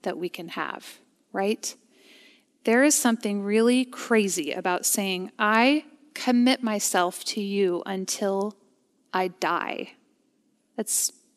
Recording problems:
none

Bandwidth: 14 kHz